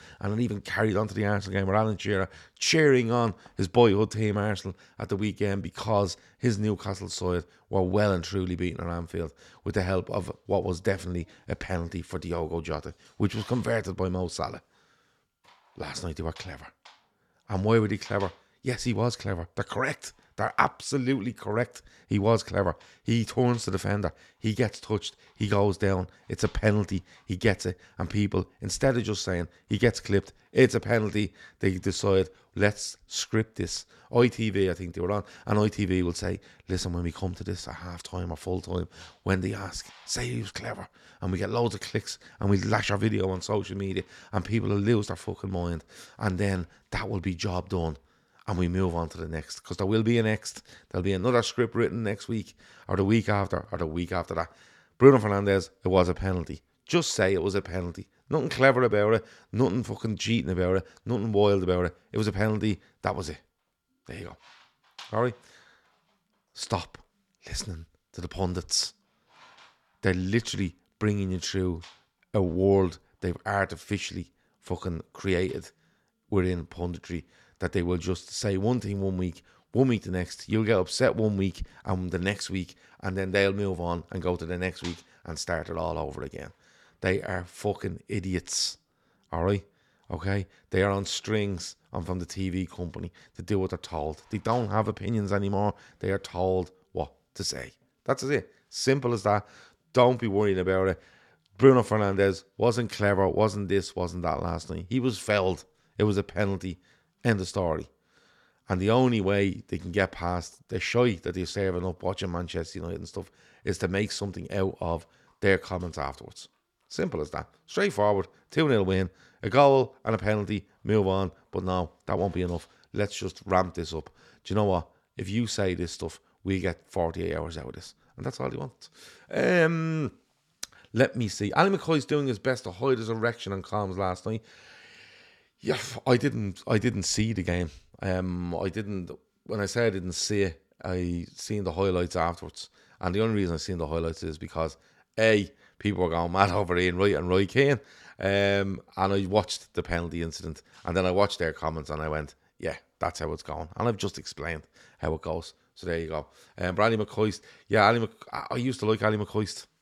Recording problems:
none

